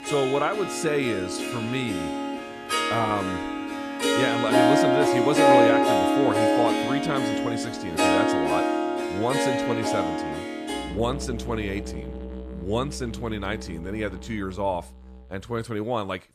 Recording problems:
background music; very loud; throughout; 4 dB above the speech

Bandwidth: 14 kHz